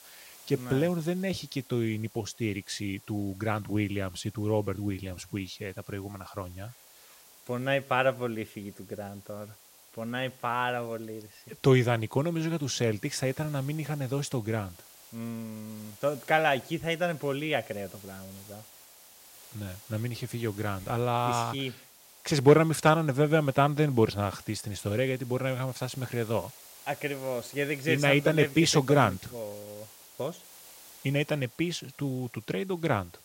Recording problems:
hiss; faint; throughout; 20 dB below the speech

